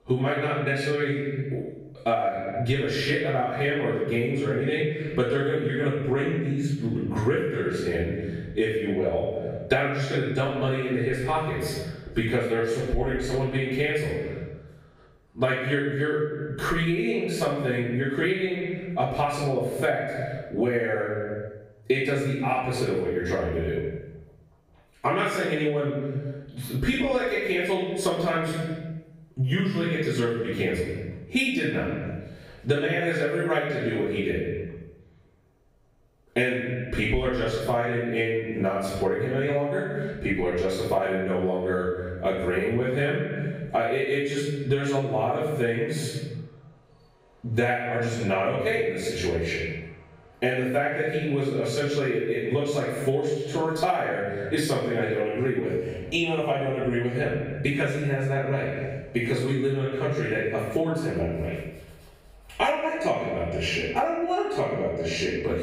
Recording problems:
off-mic speech; far
room echo; noticeable; dies away in 0.8 s
echo of what is said; faint; throughout; 120 ms later, 25 dB below the speech
squashed, flat; somewhat

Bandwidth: 15.5 kHz